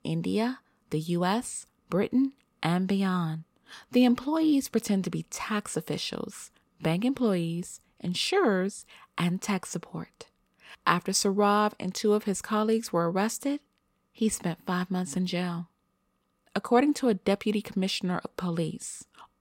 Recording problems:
none

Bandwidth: 16 kHz